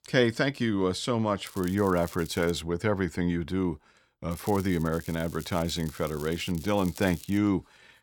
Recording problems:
crackling; noticeable; from 1.5 to 2.5 s and from 4.5 to 7.5 s; 20 dB below the speech

